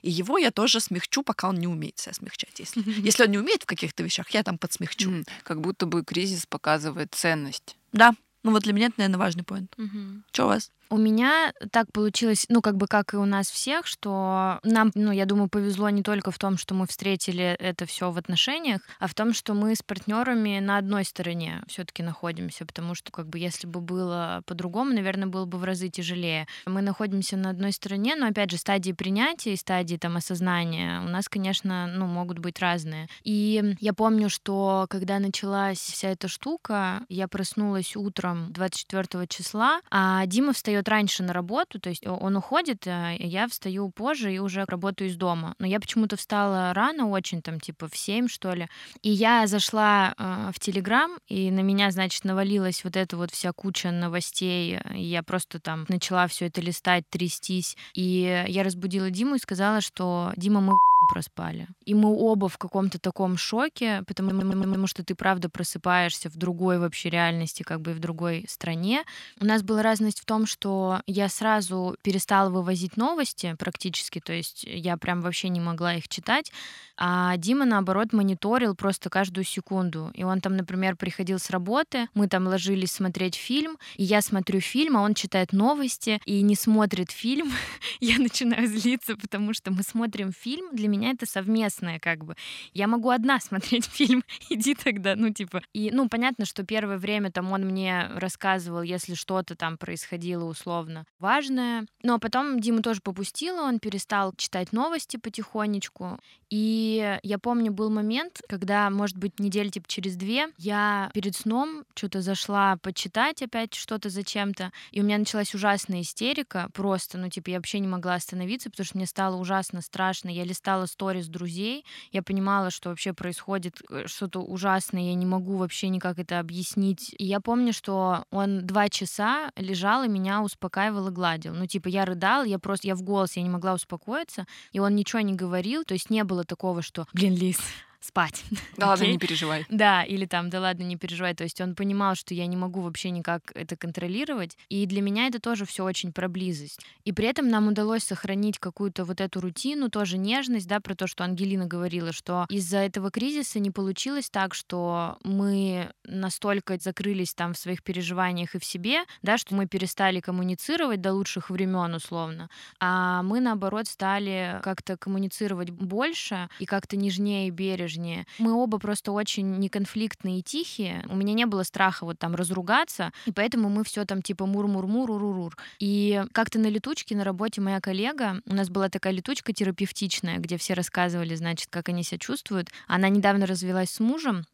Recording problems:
audio stuttering; at 1:04

